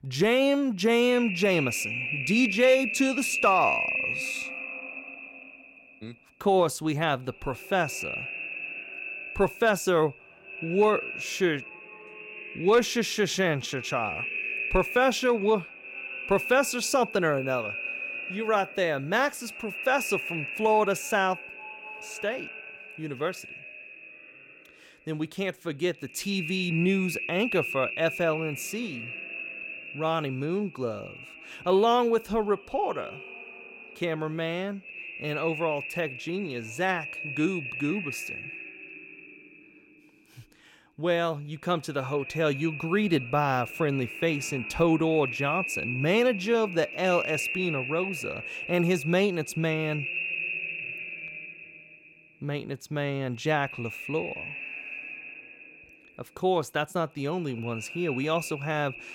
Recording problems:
echo of what is said; strong; throughout; 260 ms later, 7 dB below the speech

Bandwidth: 16.5 kHz